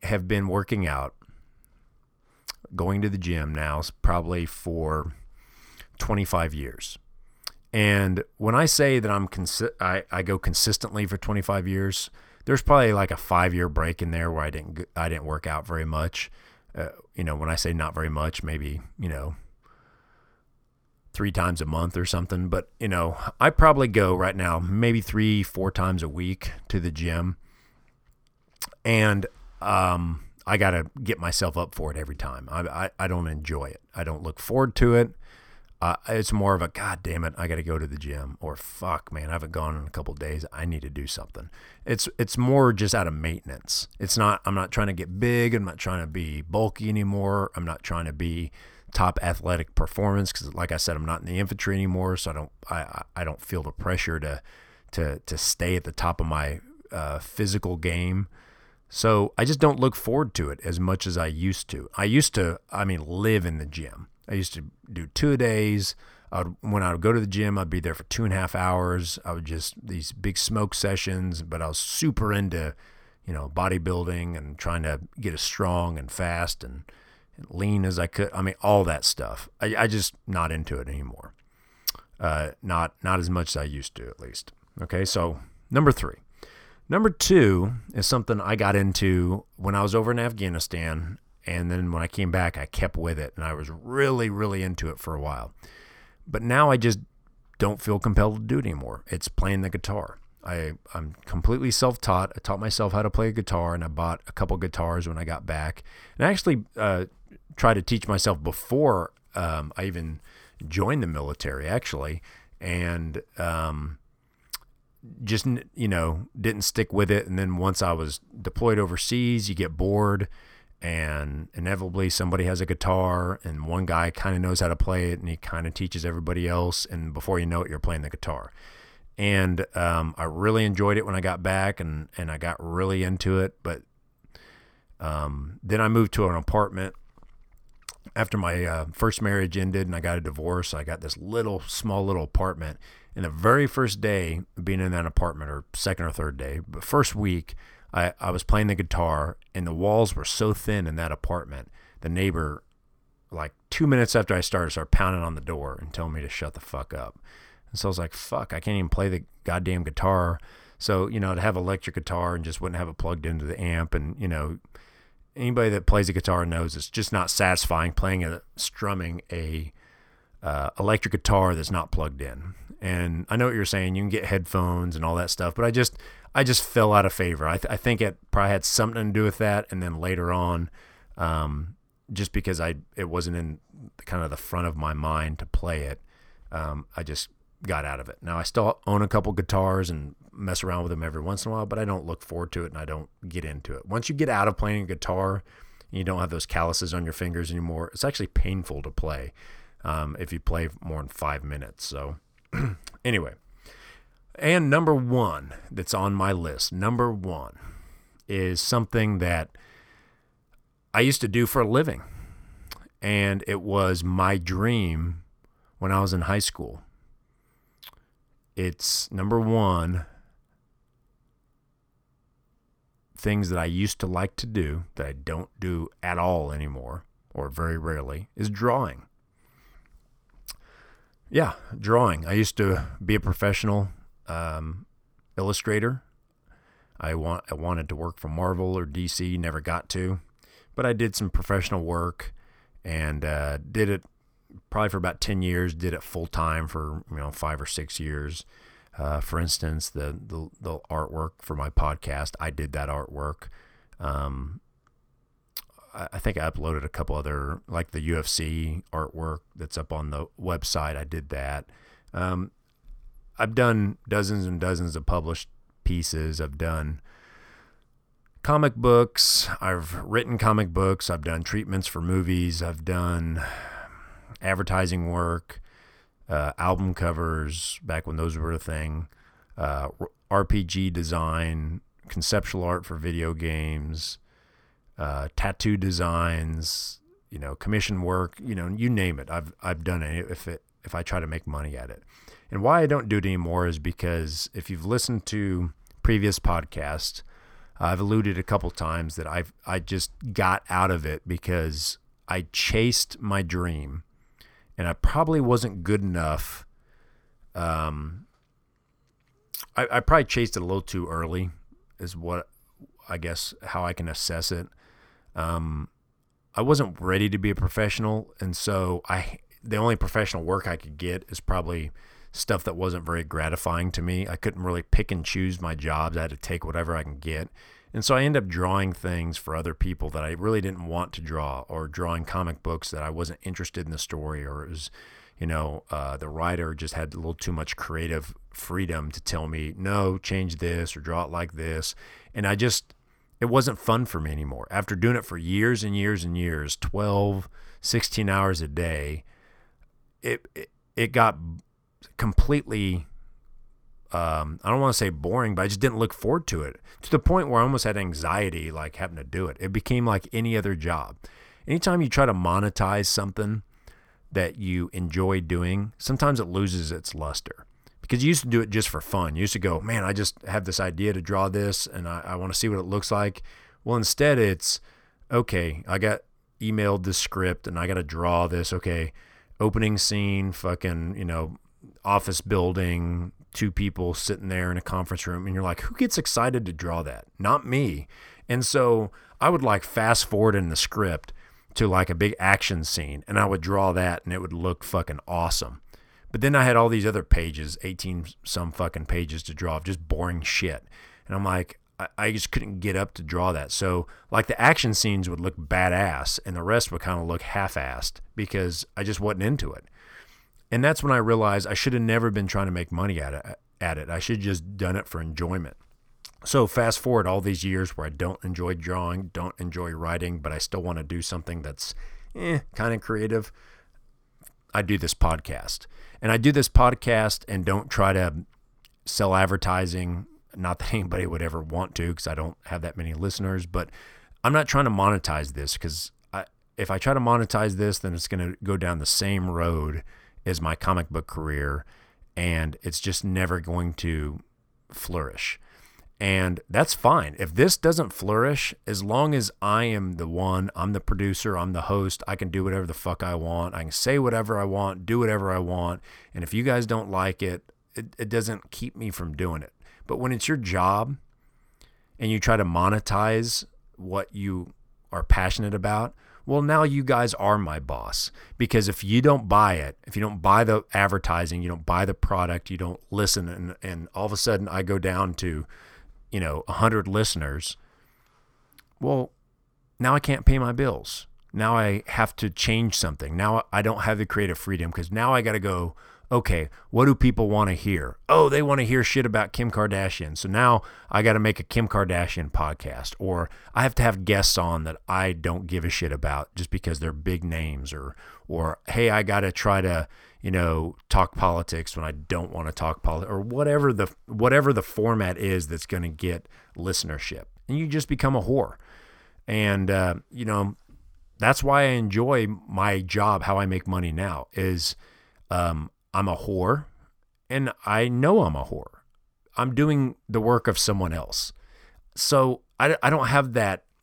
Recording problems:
none

